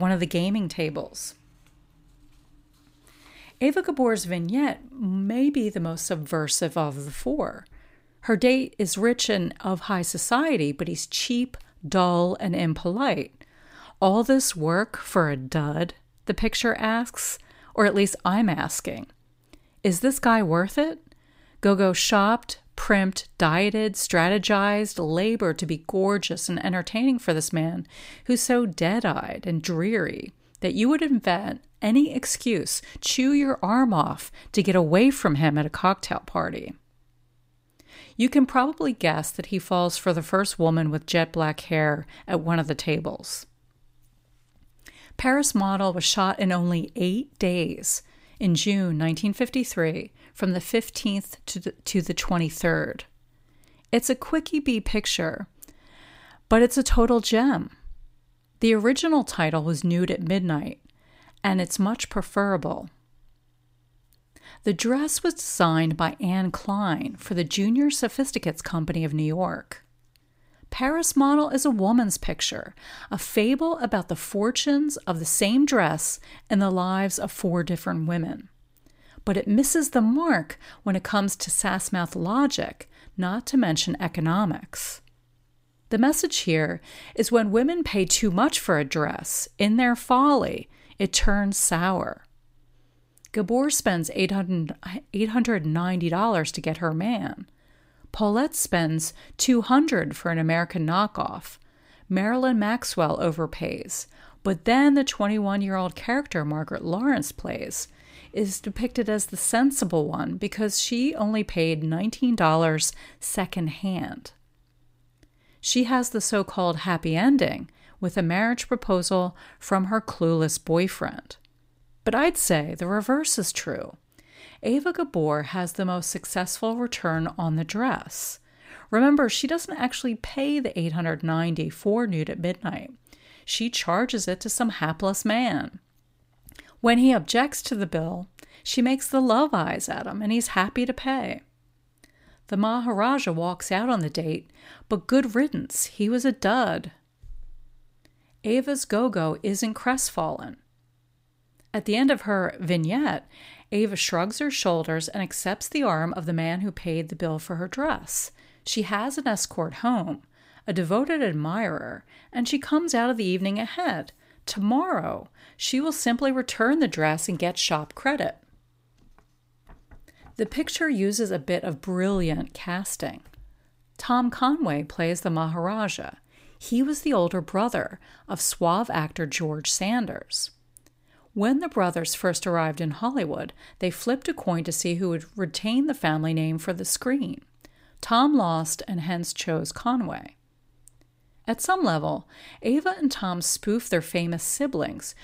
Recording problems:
abrupt cut into speech; at the start

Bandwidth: 15.5 kHz